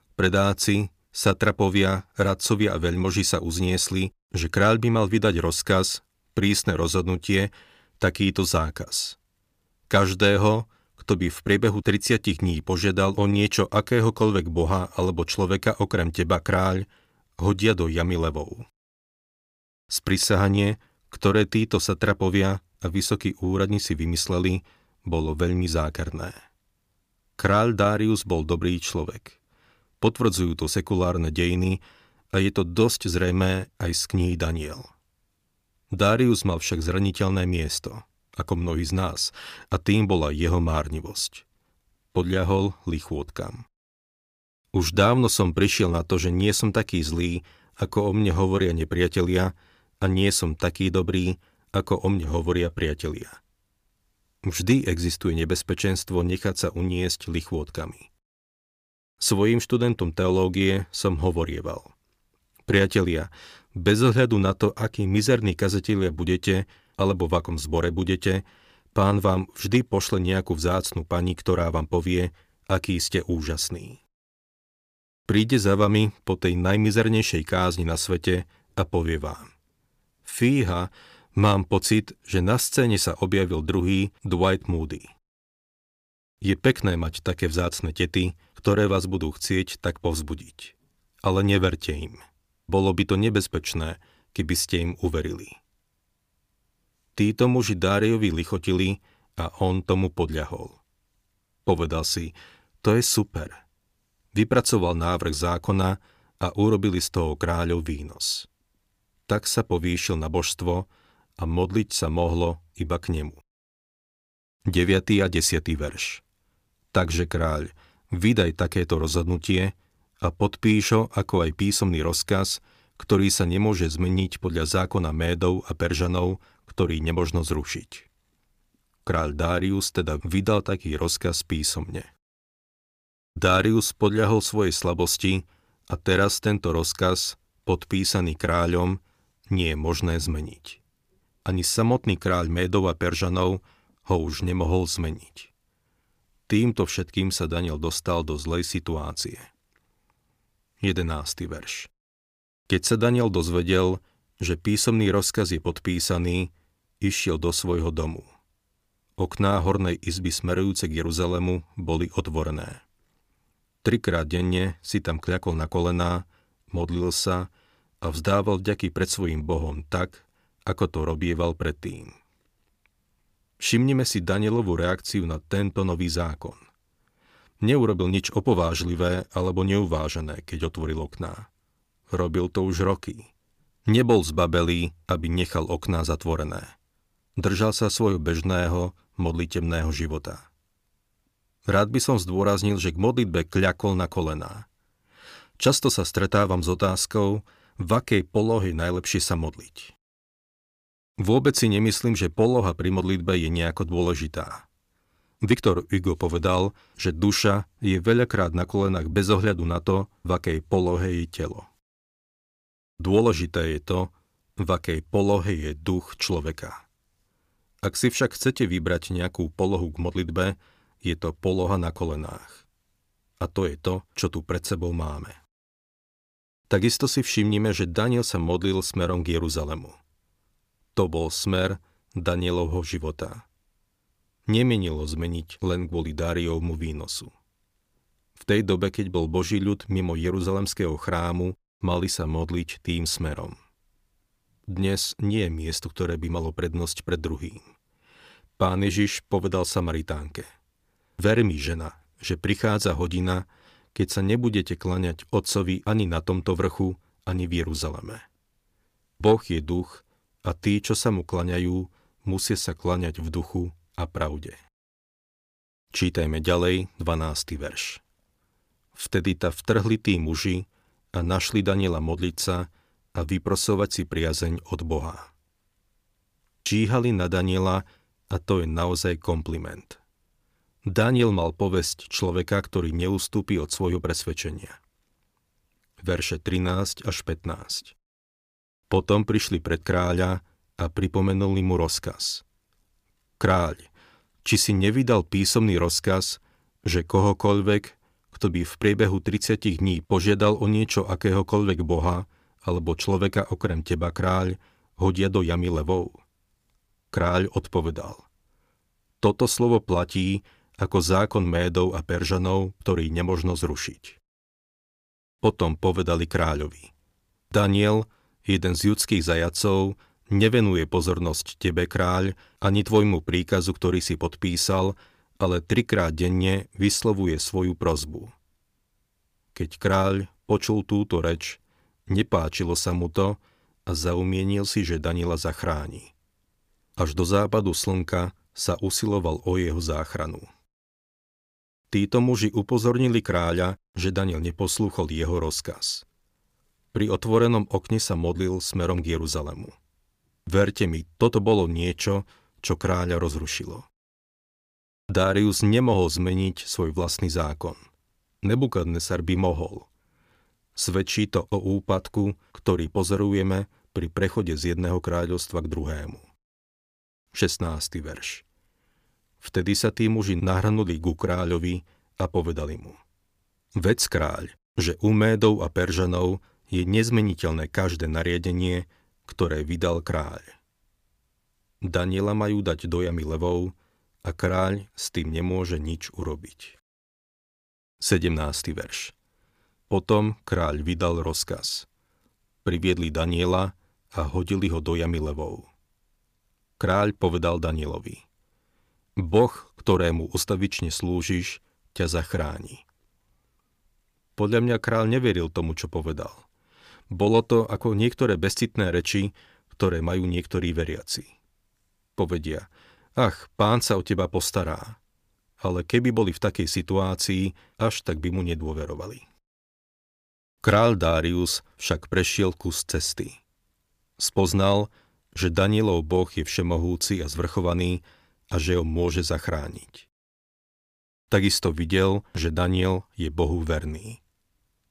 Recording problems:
uneven, jittery; slightly; from 48 s to 3:44

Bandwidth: 15 kHz